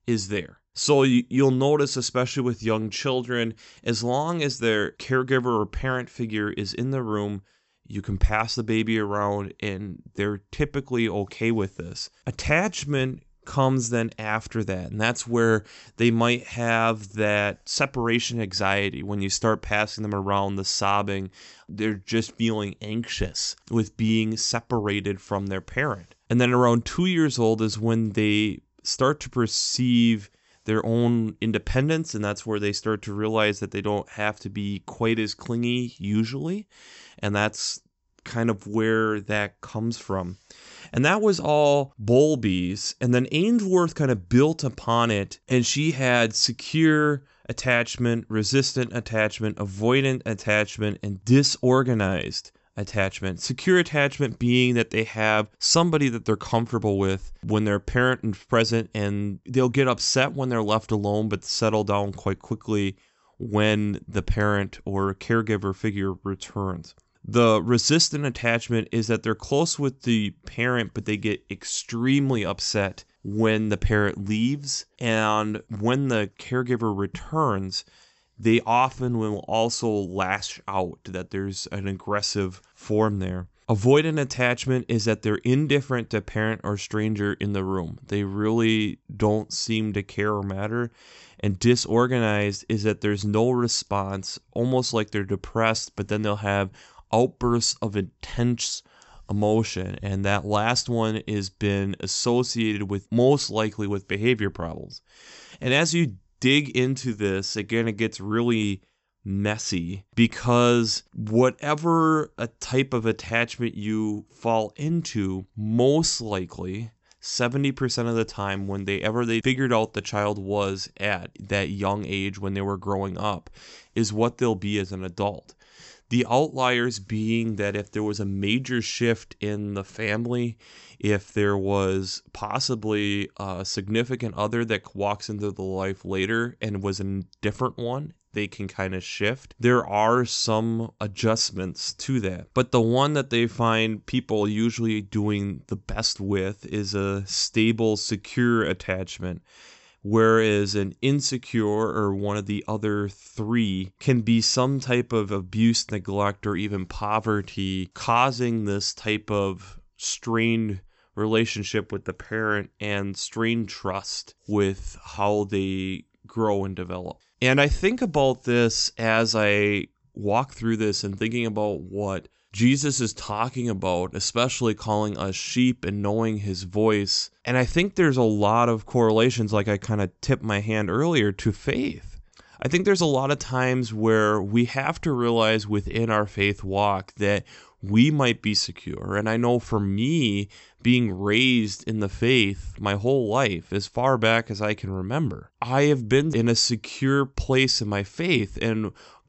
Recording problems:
high frequencies cut off; noticeable; nothing above 8 kHz

